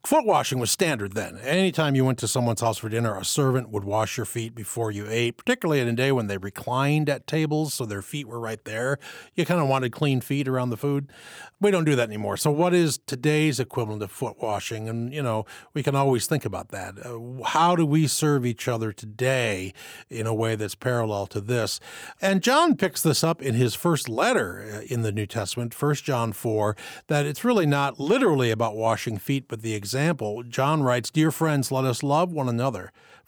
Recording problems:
none

